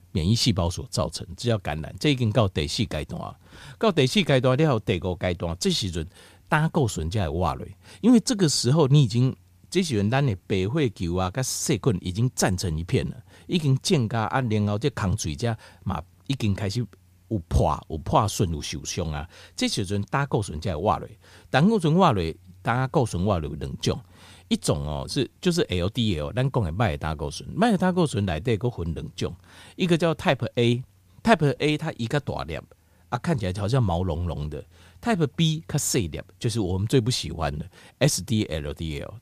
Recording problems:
none

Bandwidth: 15 kHz